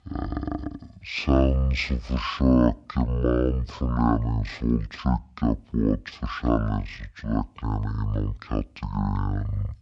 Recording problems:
wrong speed and pitch; too slow and too low; 0.5 times normal speed

